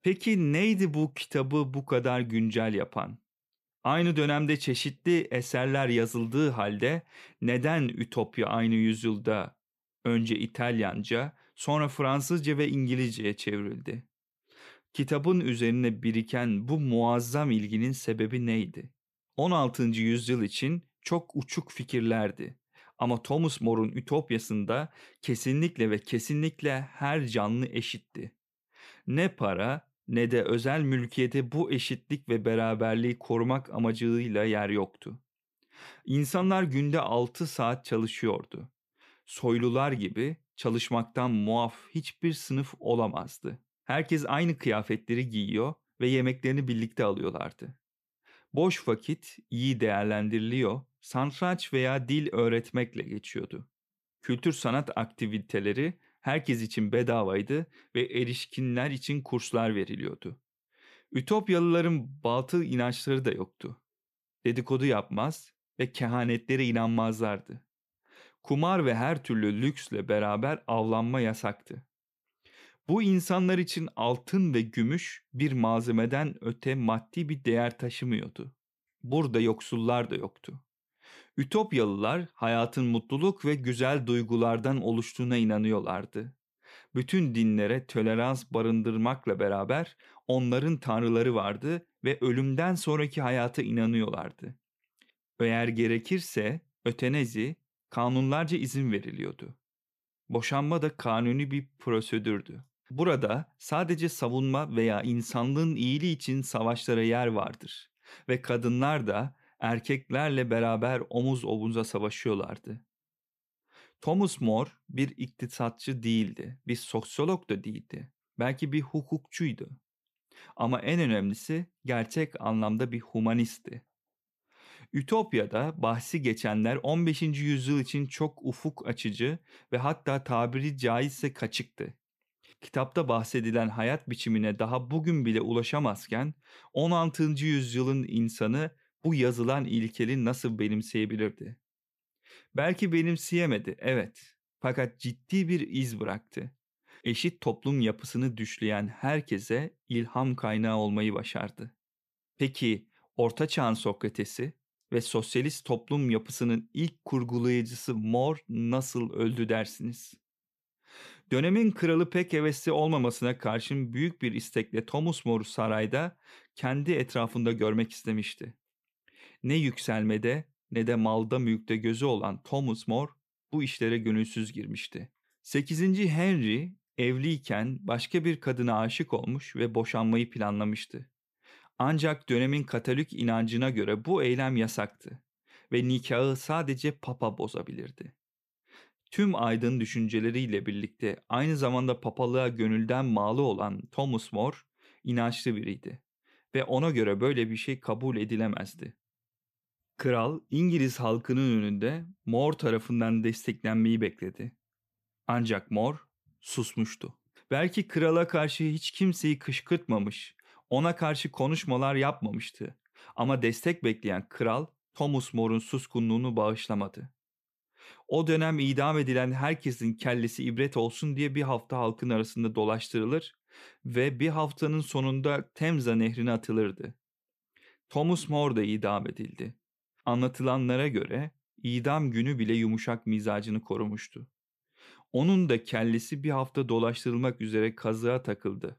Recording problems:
none

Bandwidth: 14.5 kHz